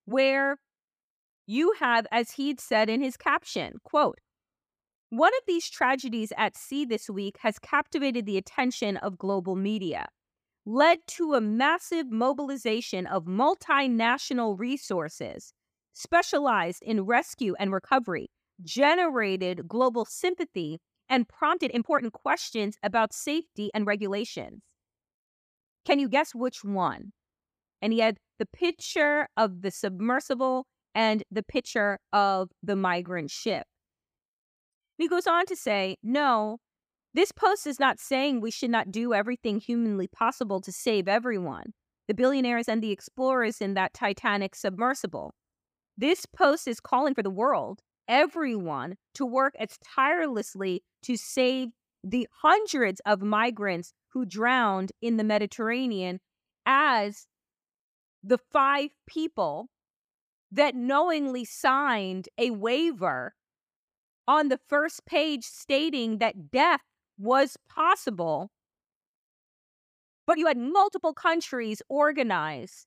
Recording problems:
uneven, jittery; strongly; from 4 s to 1:11

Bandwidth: 15 kHz